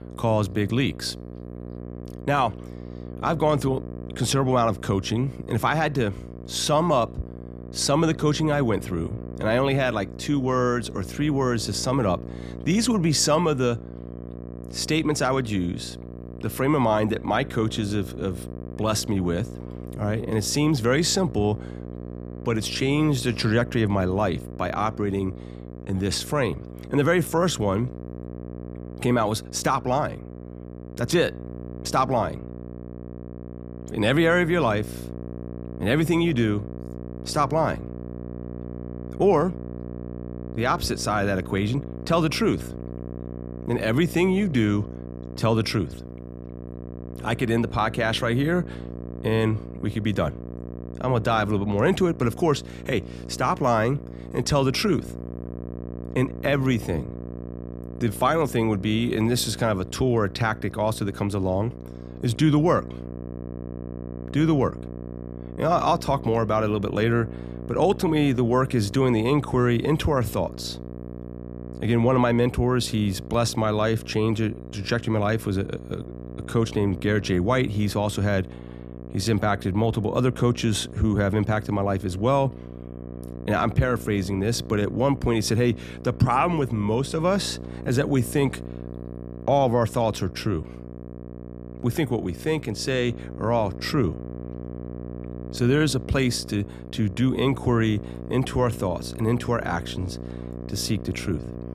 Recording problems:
electrical hum; noticeable; throughout; 60 Hz, 15 dB below the speech

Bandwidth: 14.5 kHz